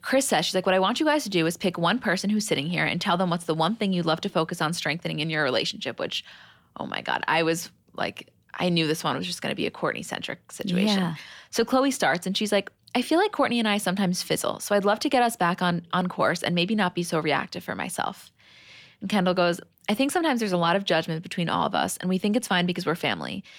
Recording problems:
none

